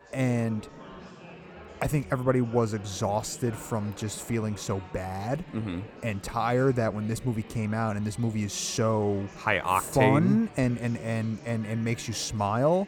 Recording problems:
chatter from many people; noticeable; throughout; 20 dB below the speech

